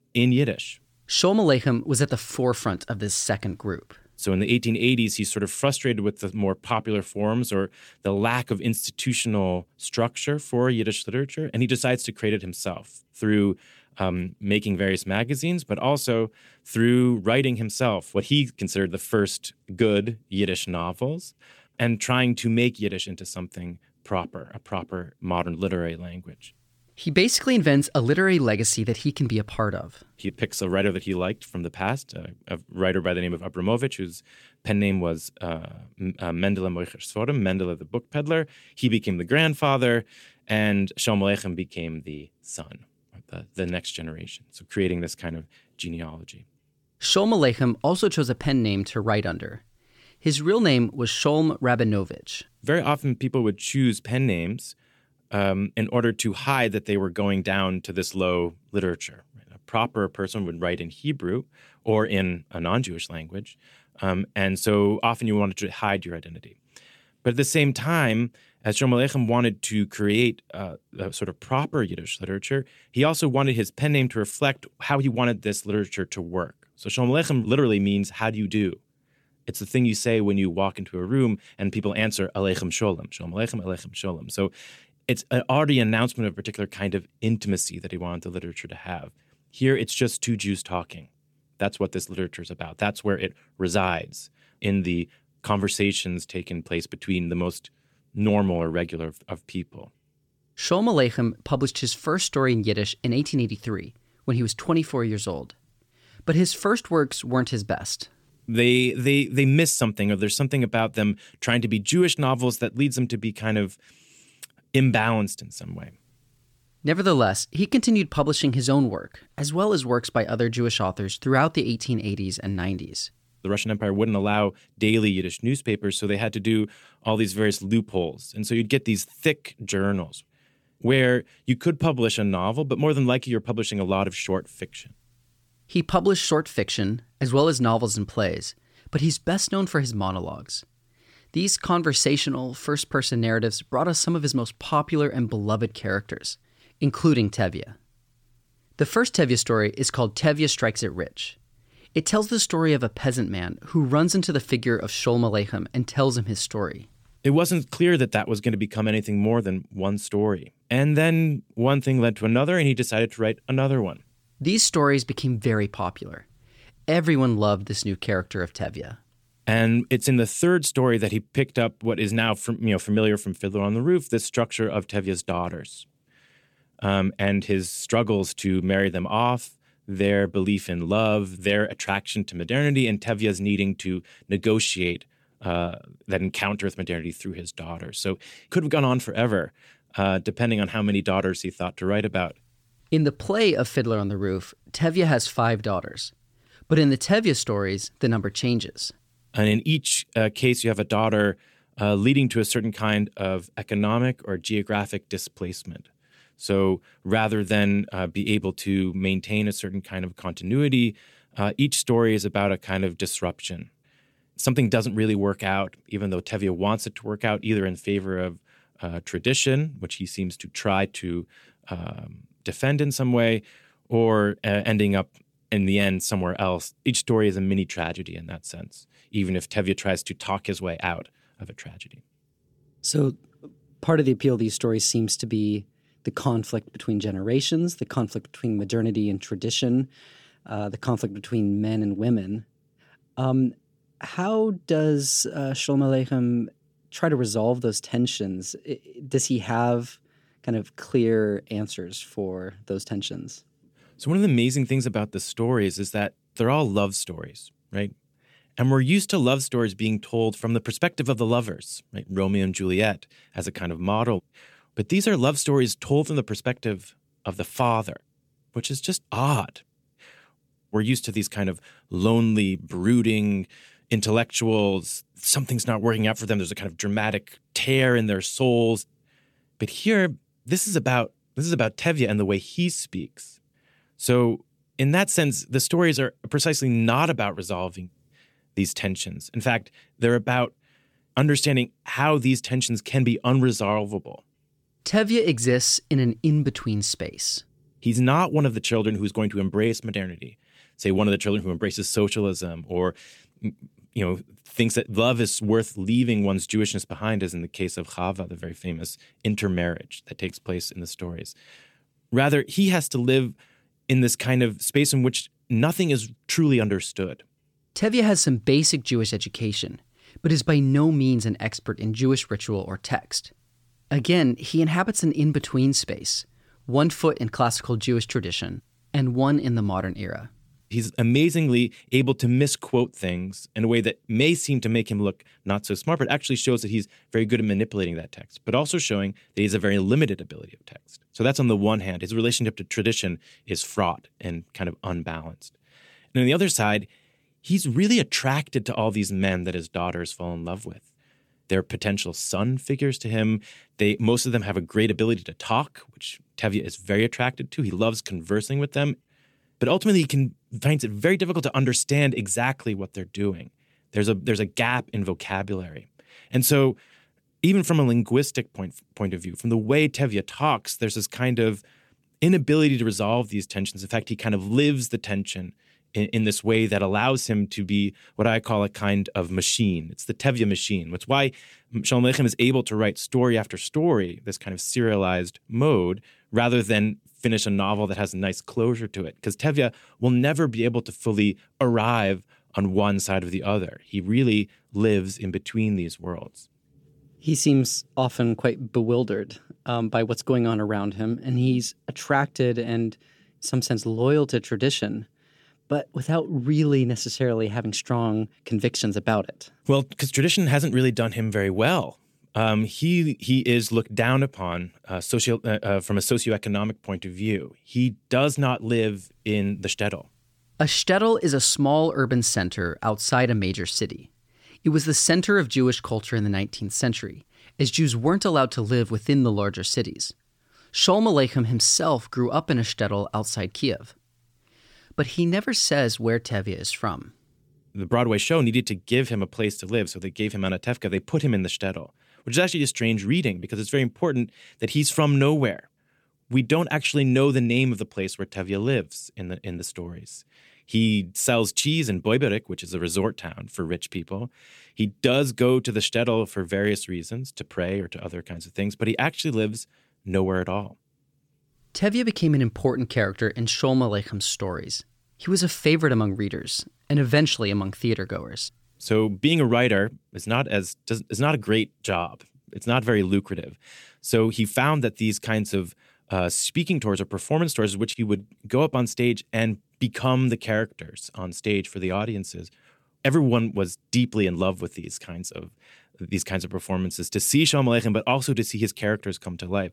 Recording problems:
none

